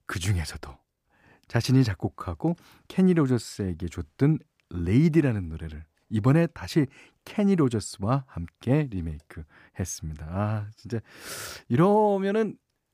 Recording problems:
none

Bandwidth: 15 kHz